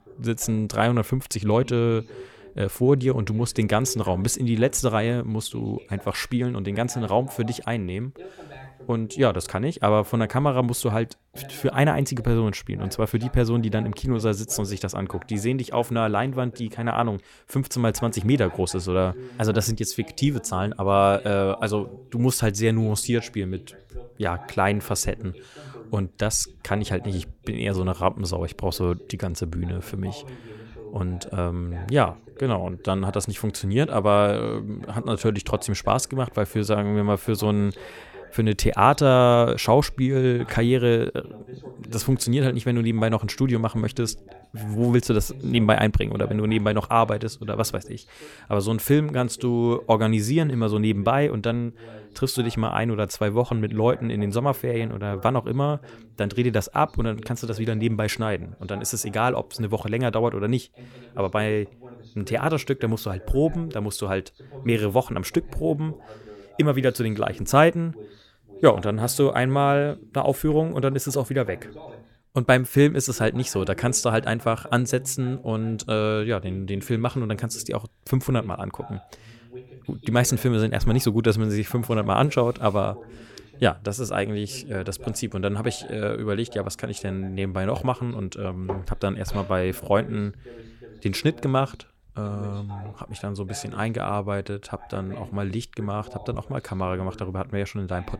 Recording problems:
voice in the background; faint; throughout; 20 dB below the speech

